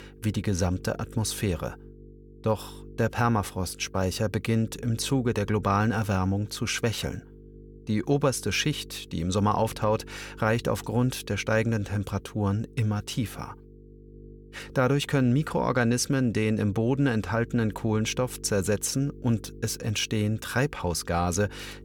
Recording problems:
electrical hum; faint; throughout; 50 Hz, 25 dB below the speech

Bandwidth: 18.5 kHz